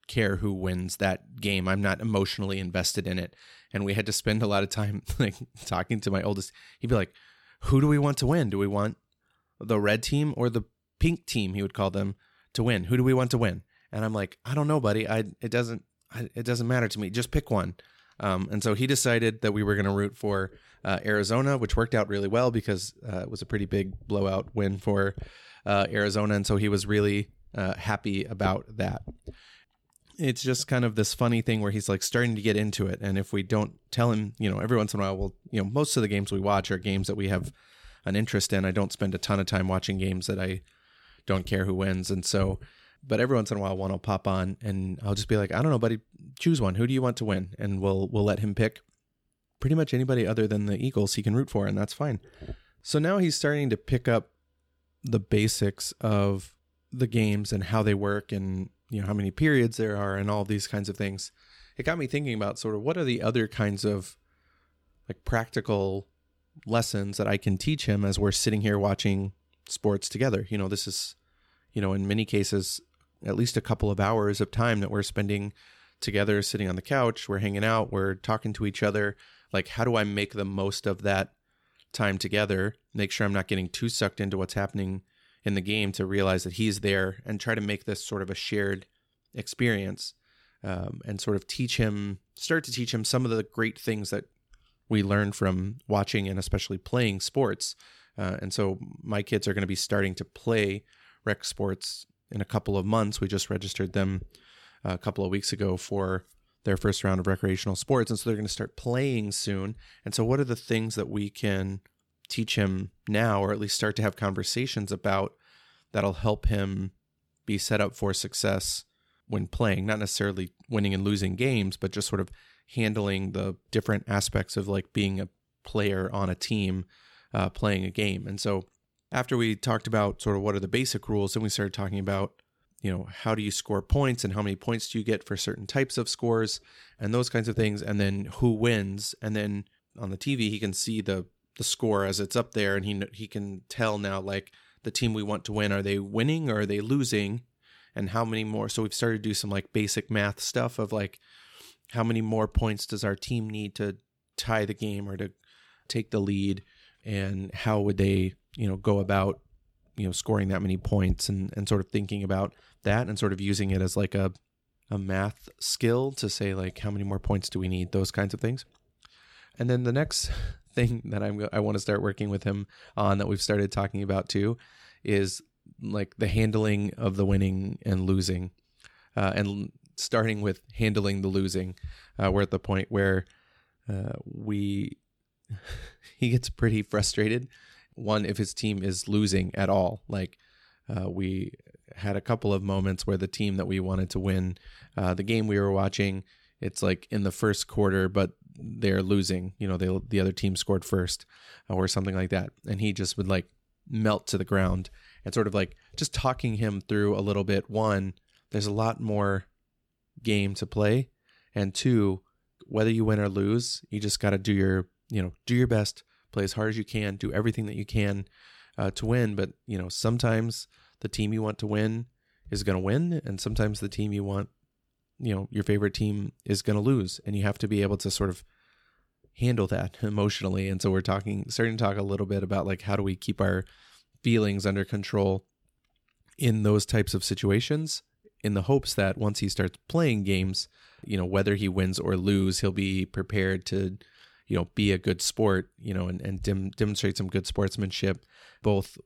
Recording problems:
none

